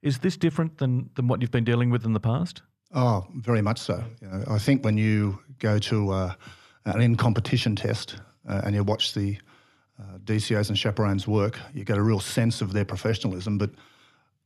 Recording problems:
none

